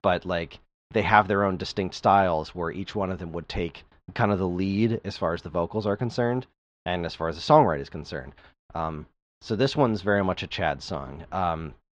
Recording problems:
muffled; slightly; fading above 4 kHz

